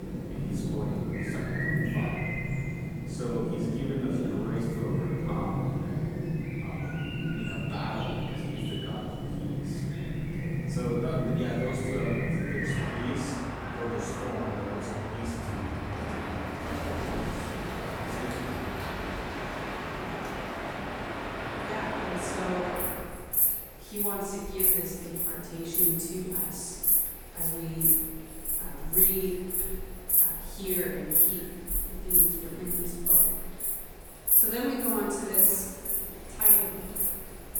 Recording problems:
room echo; strong; dies away in 1.4 s
off-mic speech; far
echo of what is said; faint; throughout; 540 ms later, 25 dB below the speech
animal sounds; very loud; throughout; 9 dB above the speech

